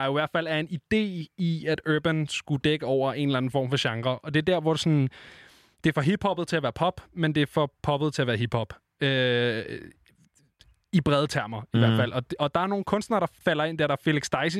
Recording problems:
abrupt cut into speech; at the start and the end

